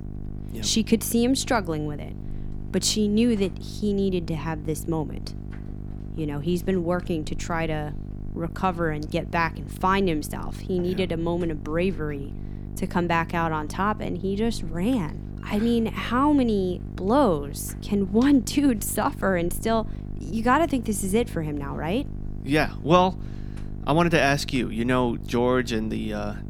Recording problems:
electrical hum; noticeable; throughout; 50 Hz, 20 dB below the speech

